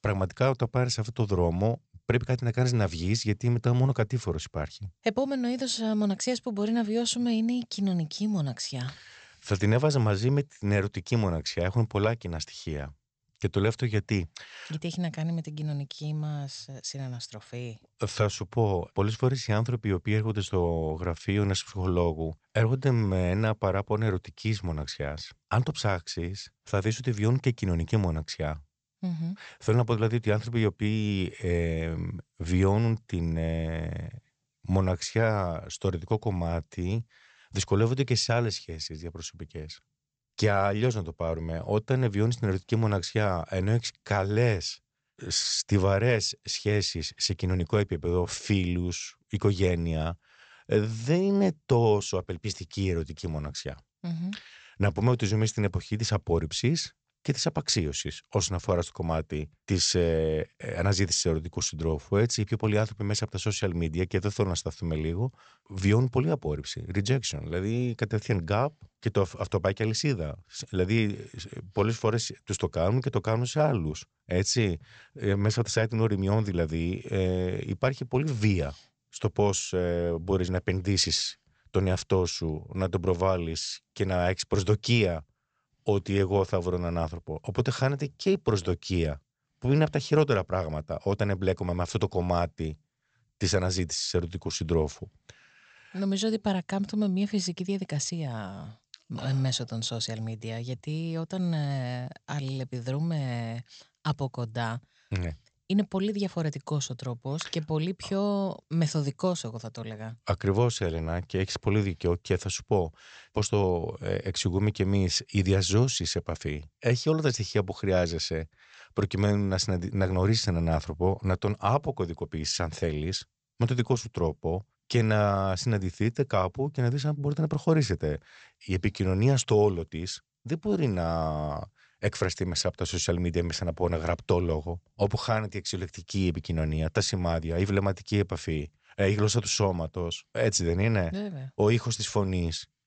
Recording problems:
high frequencies cut off; noticeable; nothing above 8 kHz

